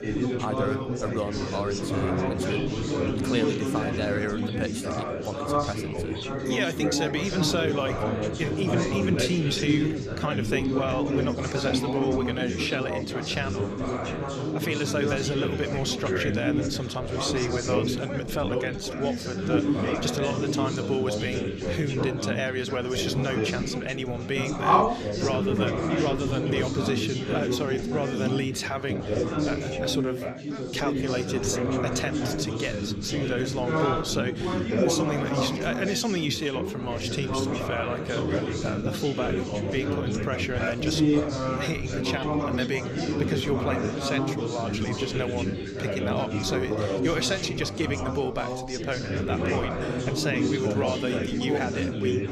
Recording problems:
chatter from many people; very loud; throughout; 2 dB above the speech

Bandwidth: 14.5 kHz